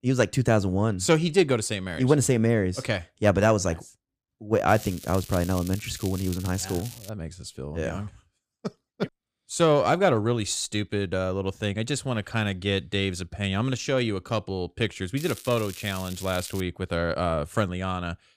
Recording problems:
crackling; noticeable; from 4.5 to 7 s and from 15 to 17 s; 15 dB below the speech

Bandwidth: 15 kHz